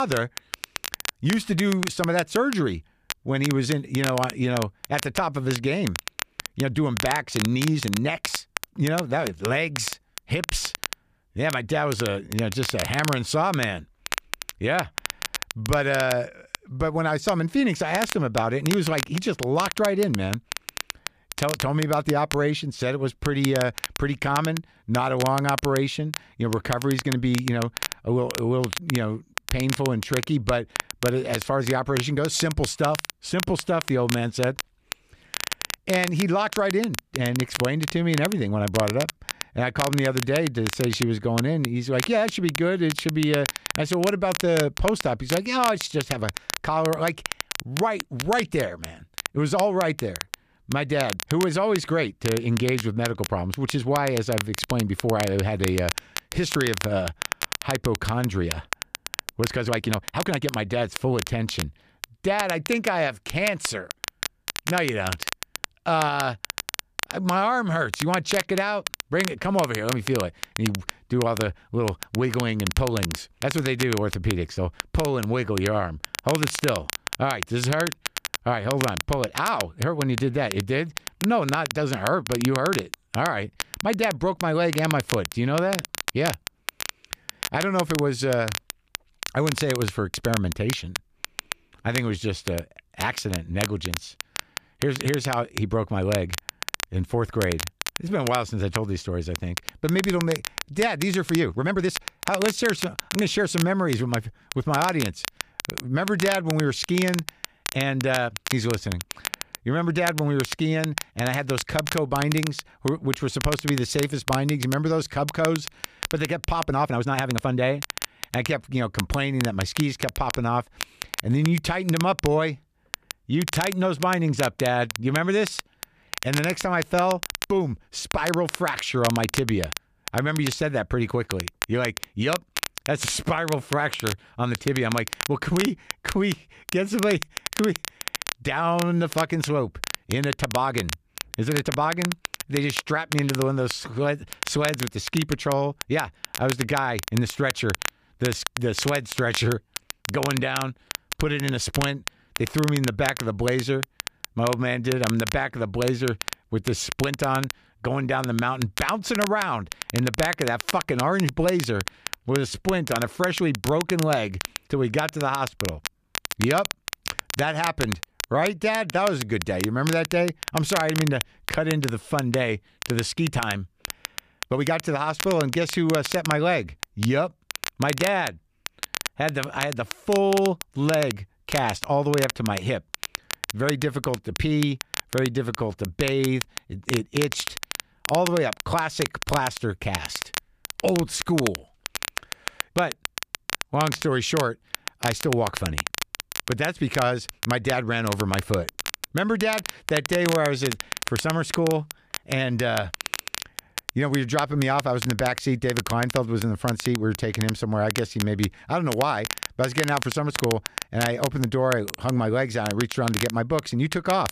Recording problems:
crackle, like an old record; loud; 7 dB below the speech
abrupt cut into speech; at the start
uneven, jittery; strongly; from 27 s to 3:20

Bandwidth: 14.5 kHz